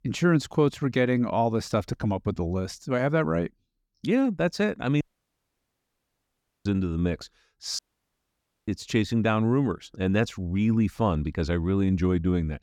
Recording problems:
audio cutting out; at 5 s for 1.5 s and at 8 s for 1 s

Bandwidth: 18 kHz